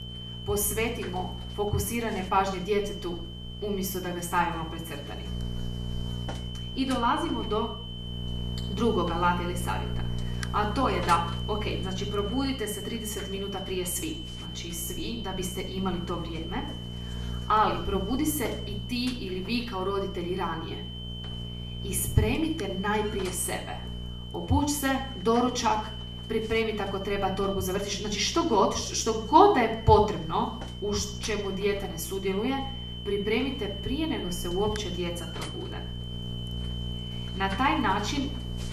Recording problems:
off-mic speech; far
room echo; slight; dies away in 0.5 s
electrical hum; noticeable; throughout; 60 Hz, 20 dB below the speech
high-pitched whine; noticeable; throughout; 3 kHz, 15 dB below the speech

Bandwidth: 14.5 kHz